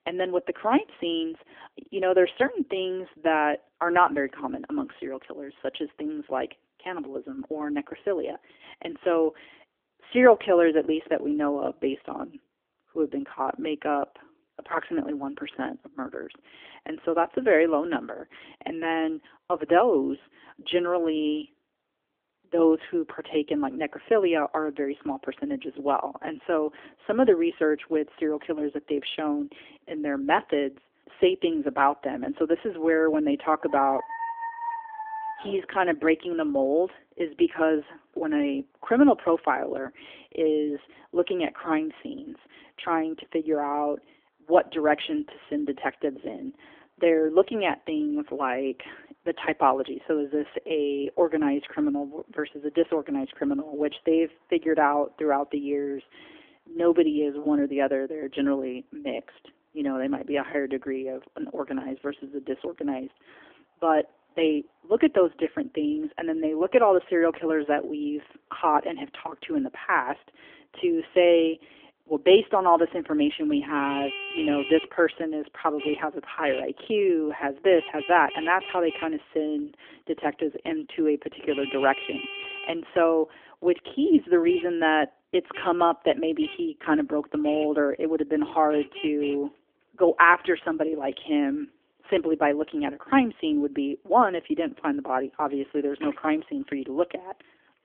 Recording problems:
phone-call audio; nothing above 3.5 kHz
traffic noise; noticeable; throughout; 10 dB below the speech
dog barking; noticeable; from 34 to 36 s; peak 7 dB below the speech

